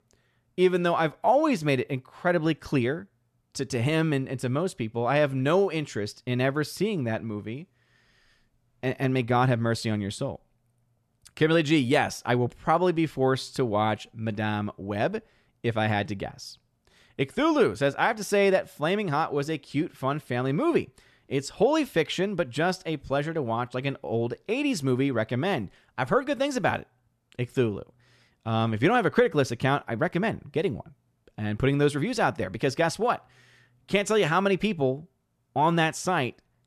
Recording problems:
none

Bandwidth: 13.5 kHz